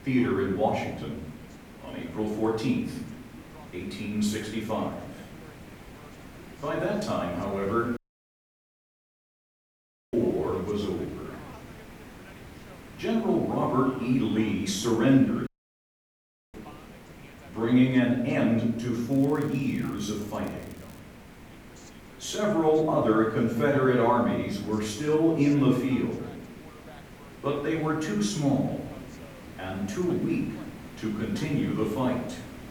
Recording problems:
off-mic speech; far
room echo; noticeable; dies away in 0.8 s
hiss; noticeable; throughout; 20 dB below the speech
voice in the background; faint; throughout; 25 dB below the speech
crackling; faint; from 19 to 21 s; 25 dB below the speech
audio cutting out; at 8 s for 2 s and at 15 s for 1 s

